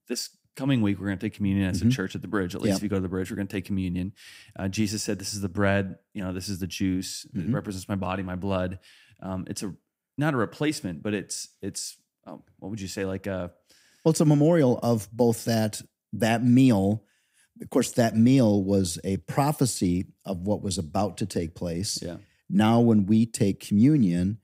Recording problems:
none

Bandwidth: 15.5 kHz